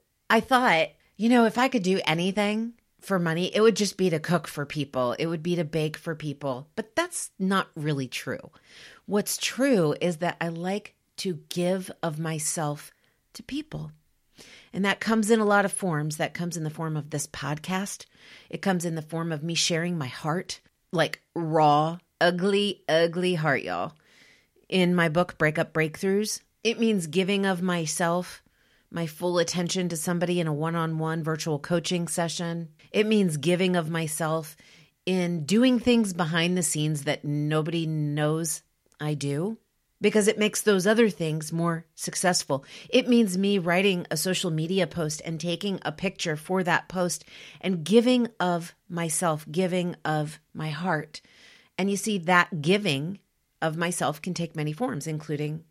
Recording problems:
none

